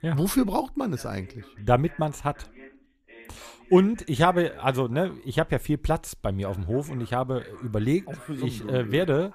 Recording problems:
voice in the background; faint; throughout; 25 dB below the speech

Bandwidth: 14.5 kHz